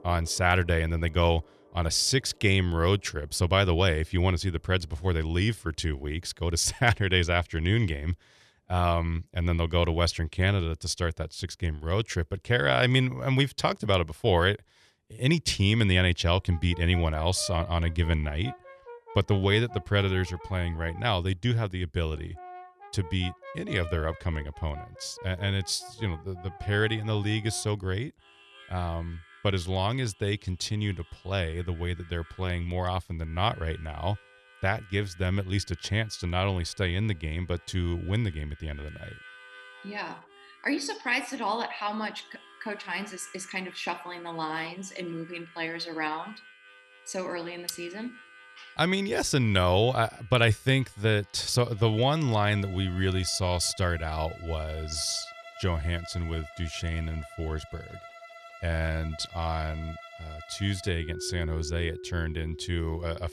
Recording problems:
background music; noticeable; throughout; 20 dB below the speech

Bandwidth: 13.5 kHz